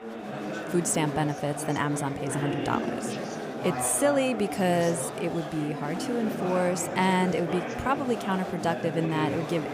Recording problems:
chatter from many people; loud; throughout; 5 dB below the speech

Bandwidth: 15 kHz